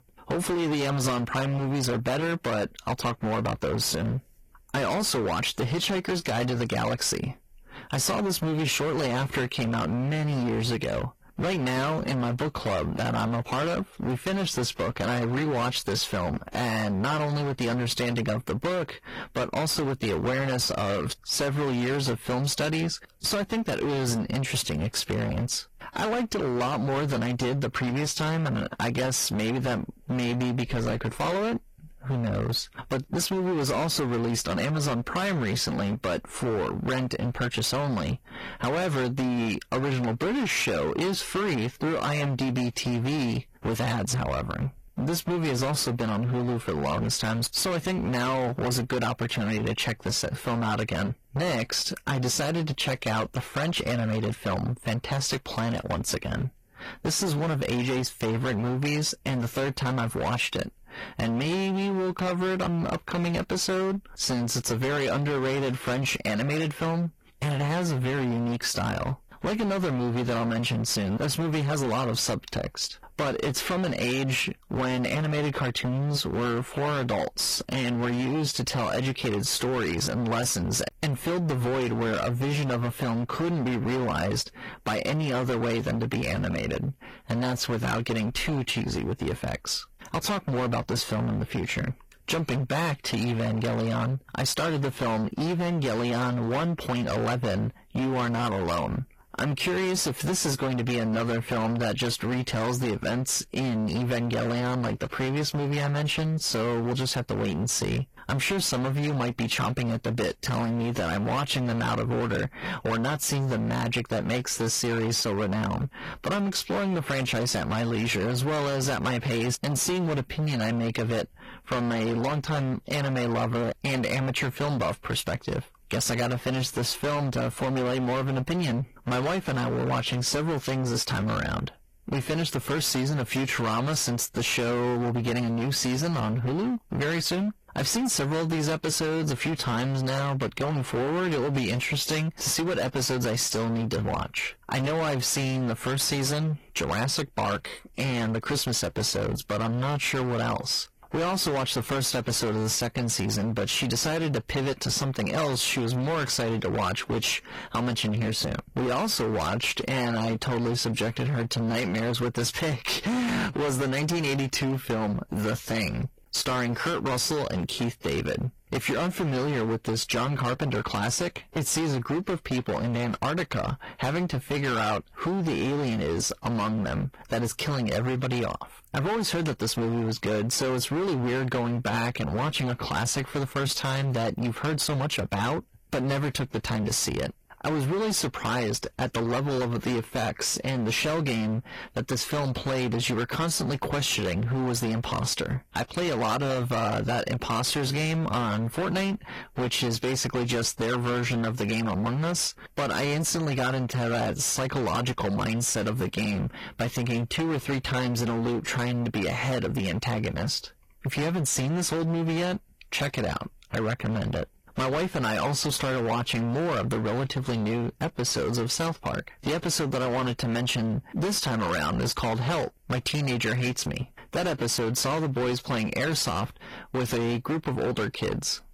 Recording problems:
distortion; heavy; 29% of the sound clipped
garbled, watery; slightly
squashed, flat; somewhat

